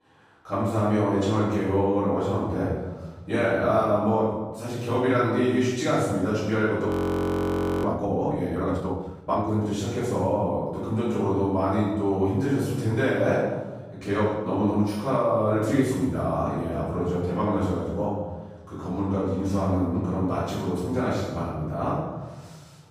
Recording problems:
room echo; strong; dies away in 1.2 s
off-mic speech; far
audio freezing; at 7 s for 1 s

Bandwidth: 15 kHz